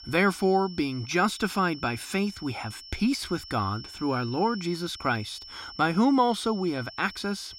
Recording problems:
high-pitched whine; noticeable; throughout; 5.5 kHz, 15 dB below the speech

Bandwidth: 16 kHz